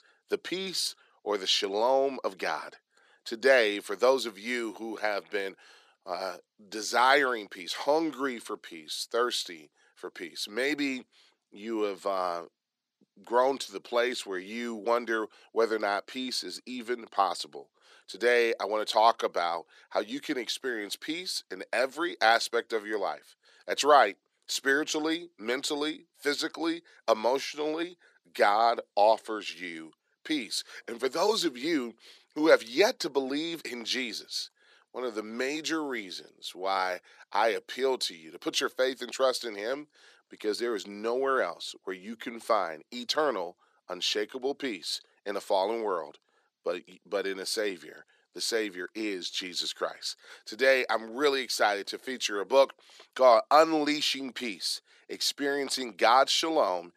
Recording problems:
thin; somewhat; fading below 400 Hz

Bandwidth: 14 kHz